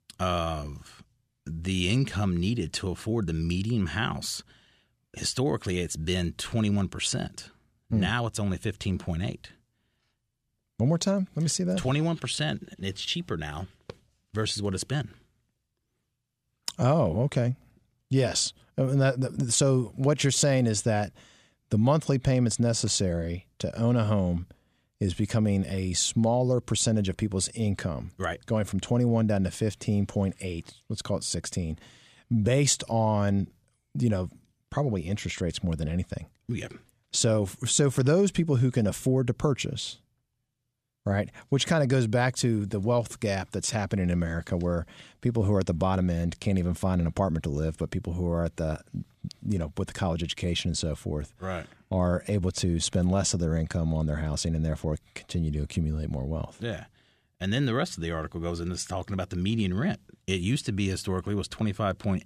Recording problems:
none

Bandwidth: 14.5 kHz